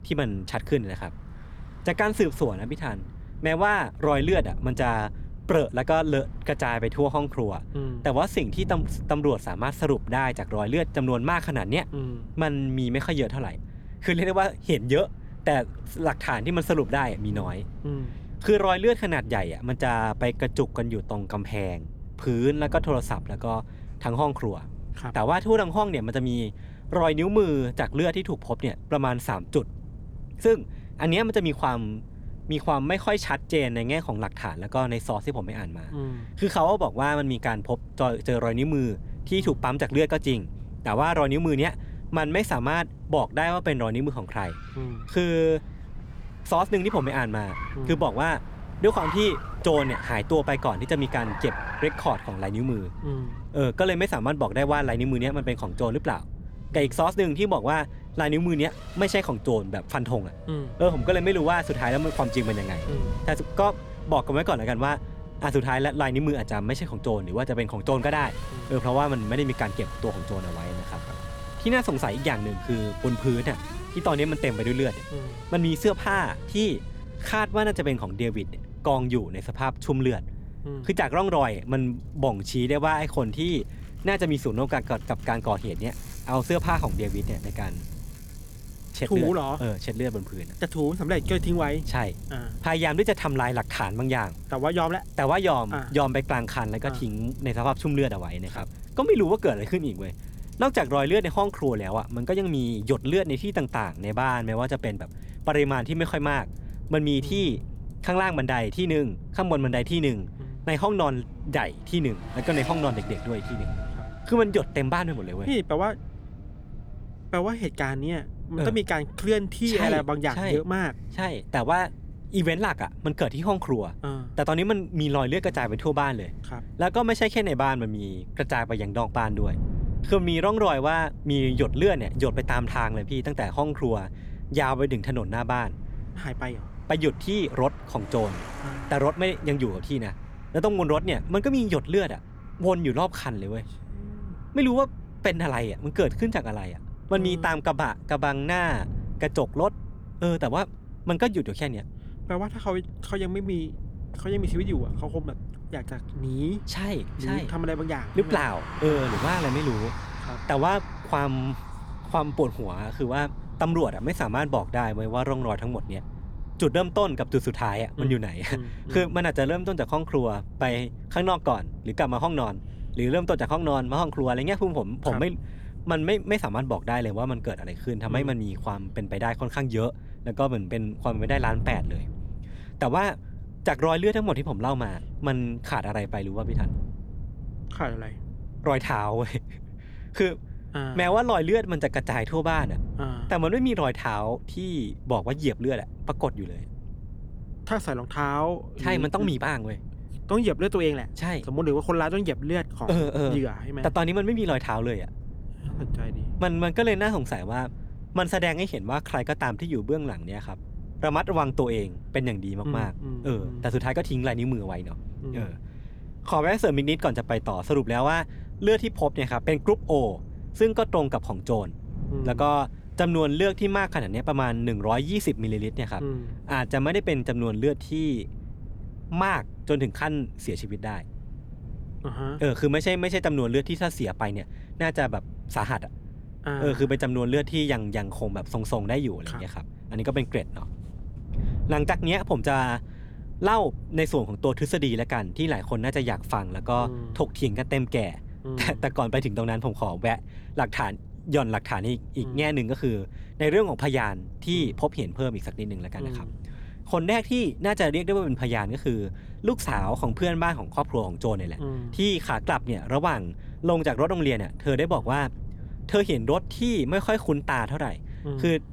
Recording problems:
traffic noise; noticeable; throughout; 20 dB below the speech
wind noise on the microphone; occasional gusts; 25 dB below the speech

